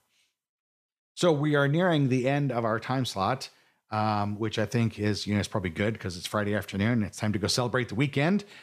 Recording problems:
none

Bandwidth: 14.5 kHz